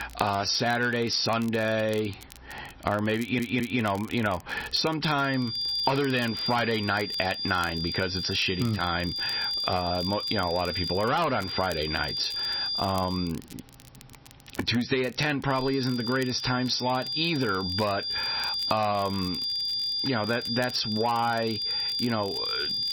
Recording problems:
squashed, flat; heavily
distortion; slight; 10 dB below the speech
garbled, watery; slightly; nothing above 6 kHz
high-pitched whine; loud; from 5 to 13 s and from 16 s on; 5 kHz, 3 dB below the speech
crackle, like an old record; faint; 20 dB below the speech
audio stuttering; at 3 s

